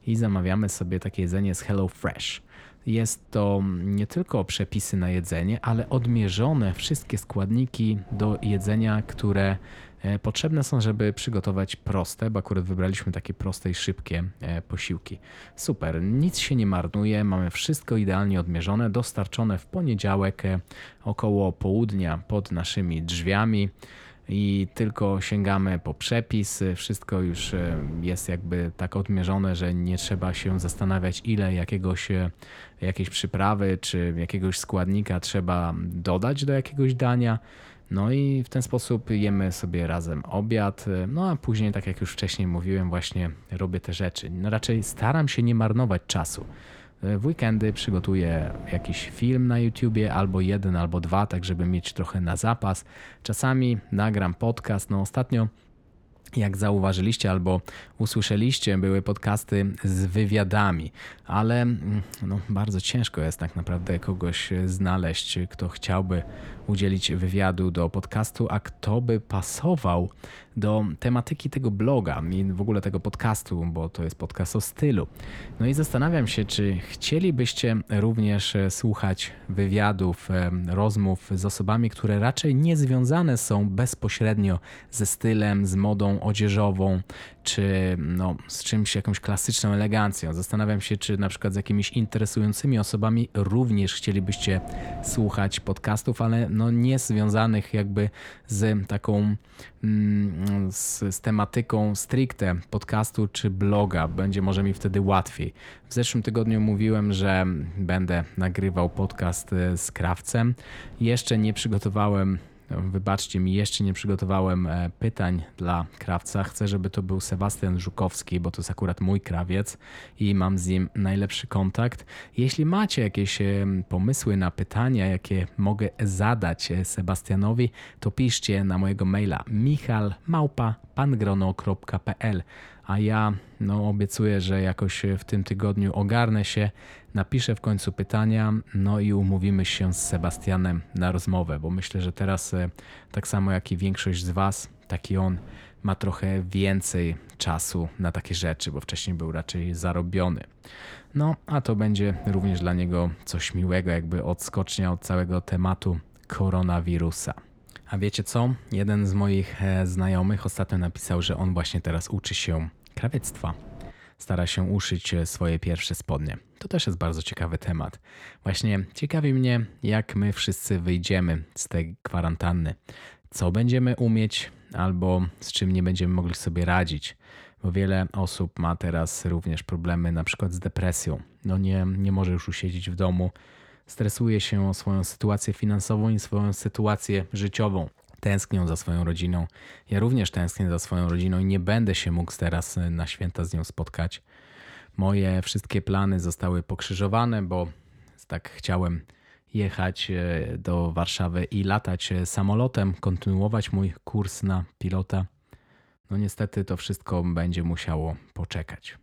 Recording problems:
wind noise on the microphone; occasional gusts; until 2:44; 25 dB below the speech

